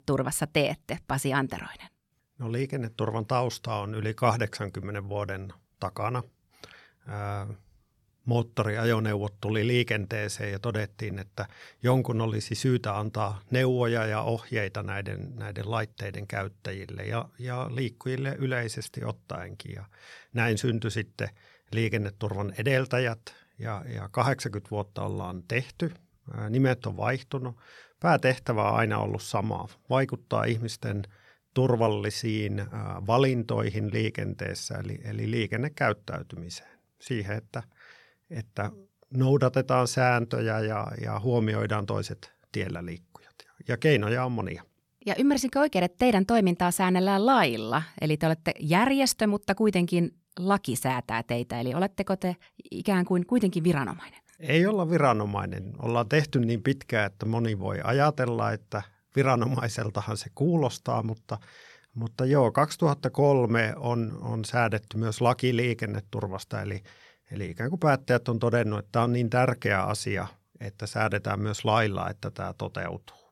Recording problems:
none

